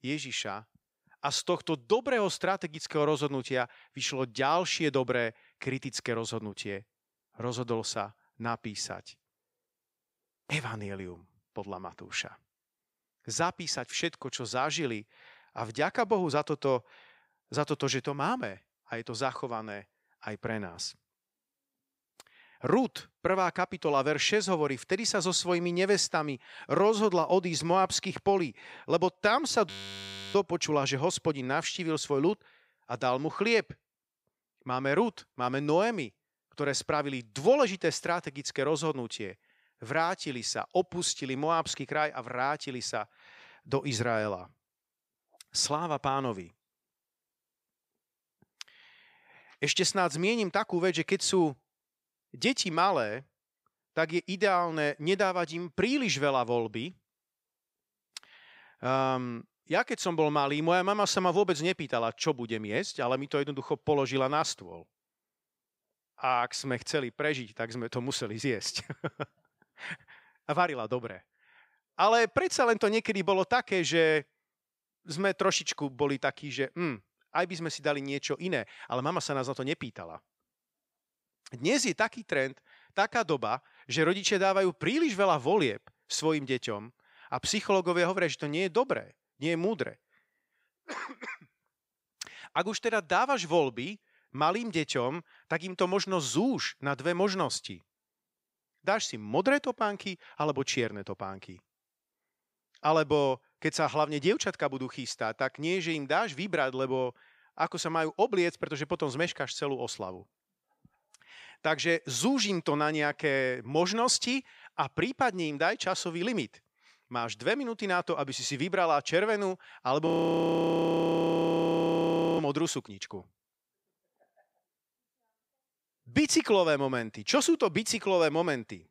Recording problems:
audio freezing; at 30 s for 0.5 s and at 2:00 for 2.5 s

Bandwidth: 15.5 kHz